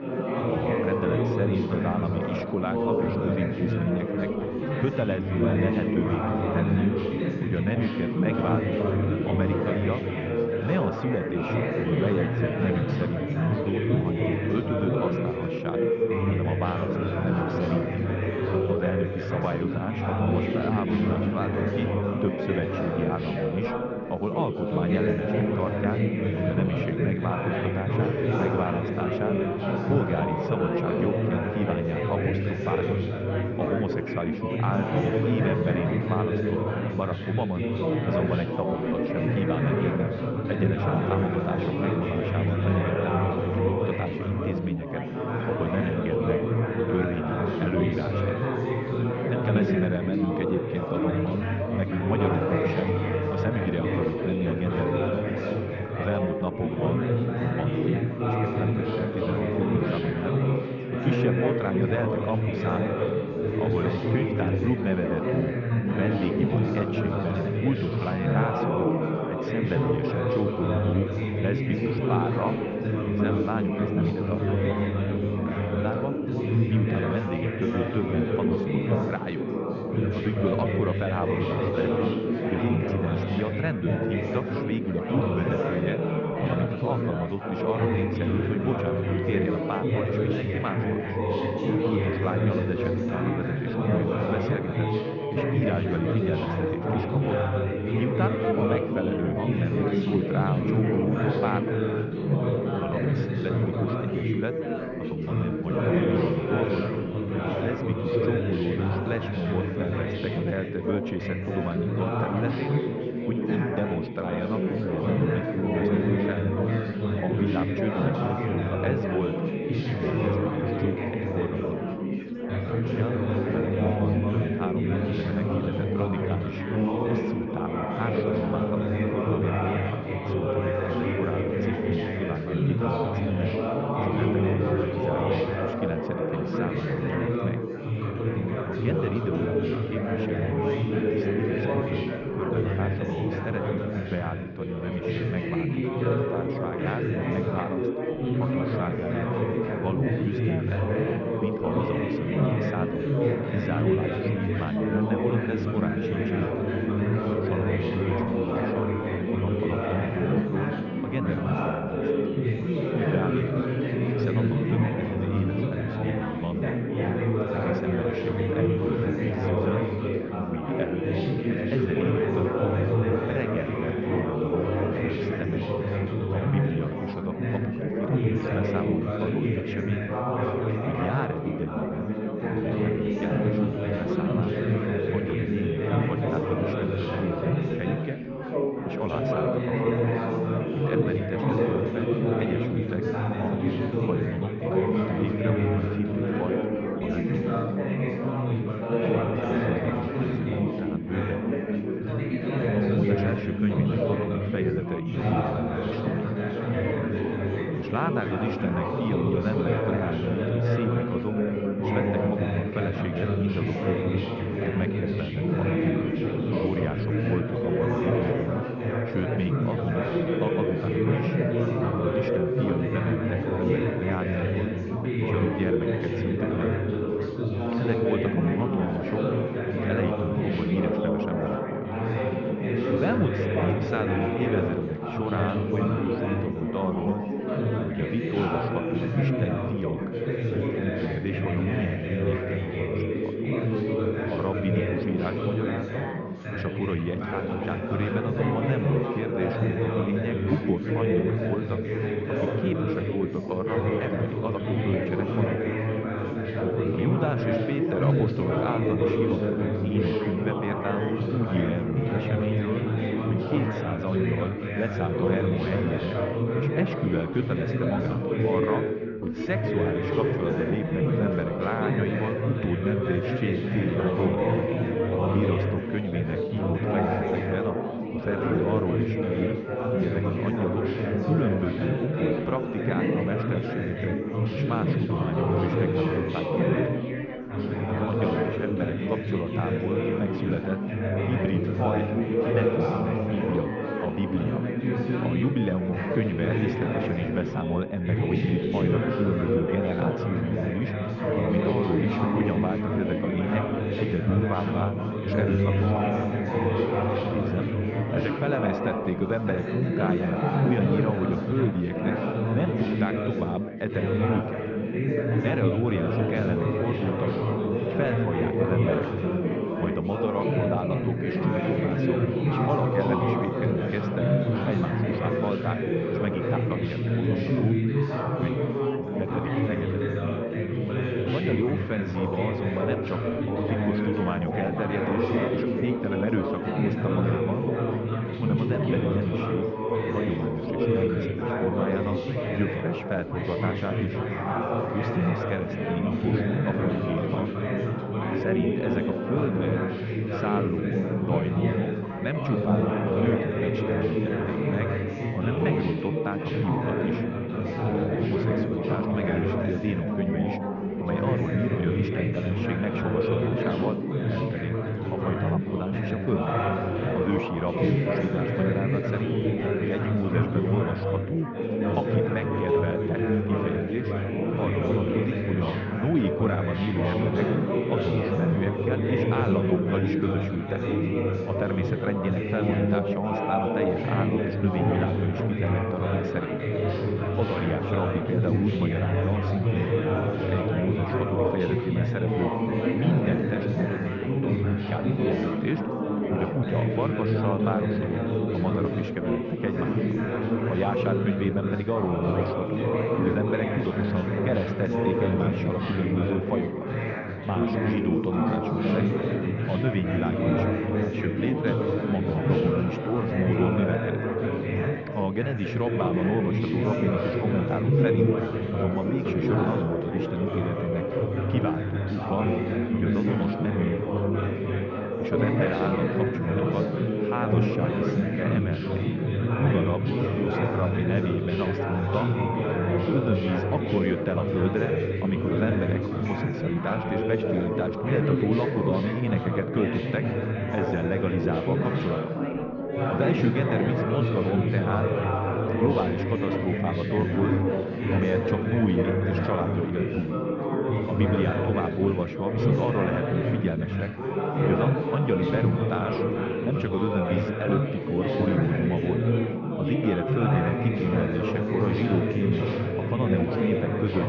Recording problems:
muffled; very slightly; fading above 2.5 kHz
high frequencies cut off; slight; nothing above 7 kHz
chatter from many people; very loud; throughout; 4 dB above the speech

